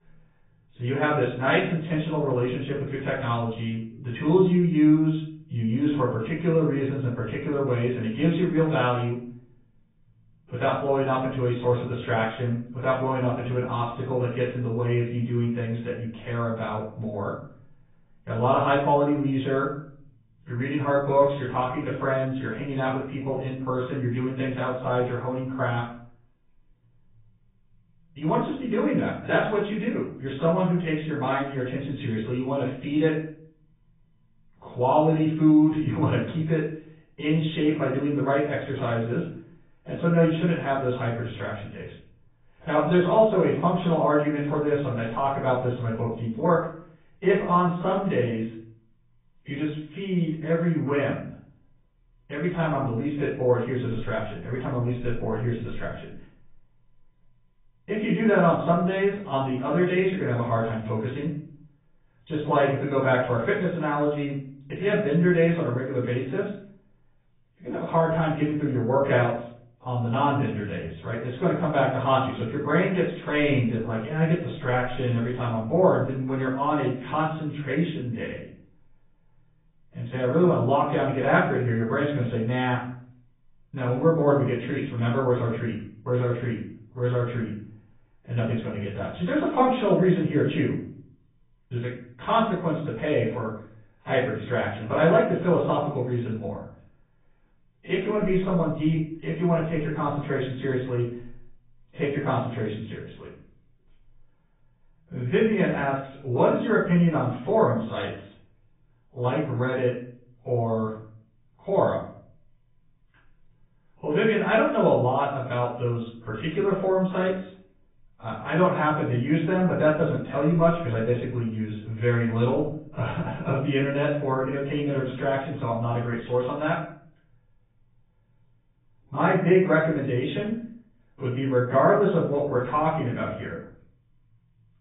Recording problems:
off-mic speech; far
garbled, watery; badly; nothing above 3.5 kHz
room echo; noticeable; dies away in 0.5 s
high frequencies cut off; slight

